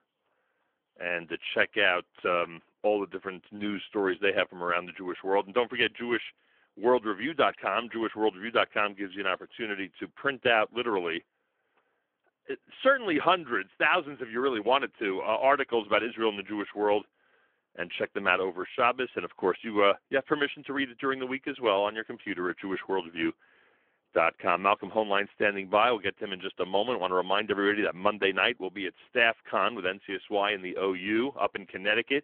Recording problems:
phone-call audio

